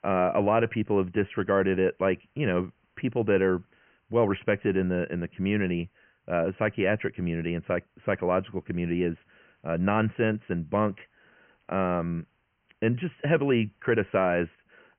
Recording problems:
high frequencies cut off; severe; nothing above 3 kHz
hiss; very faint; throughout; 45 dB below the speech

